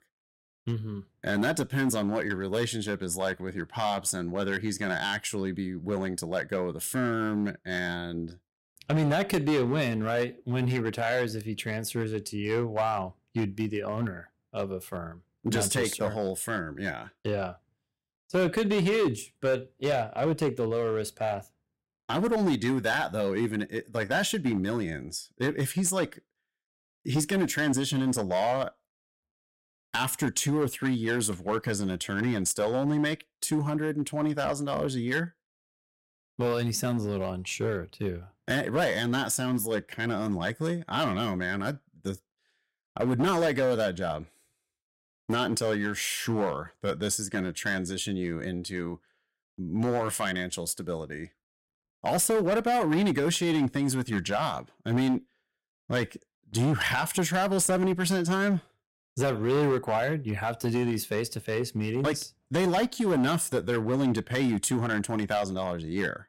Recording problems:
distortion; slight; 7% of the sound clipped

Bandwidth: 16 kHz